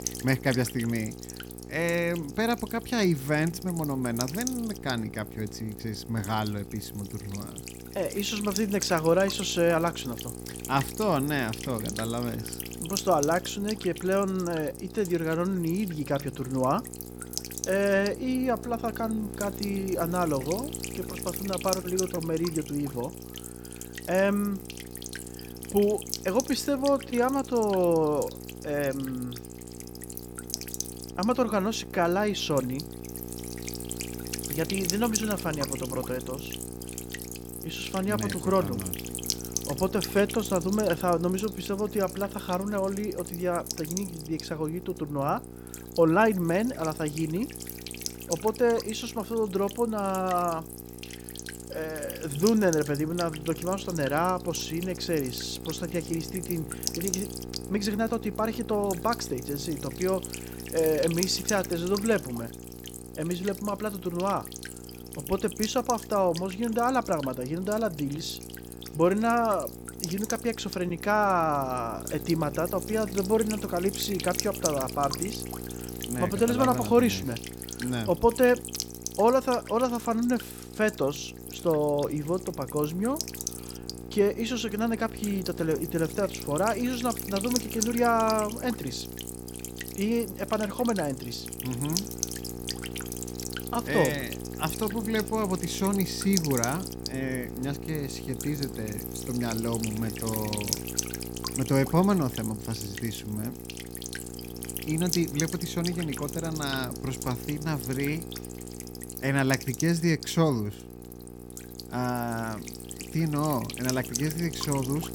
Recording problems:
electrical hum; loud; throughout; 60 Hz, 9 dB below the speech

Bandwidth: 18 kHz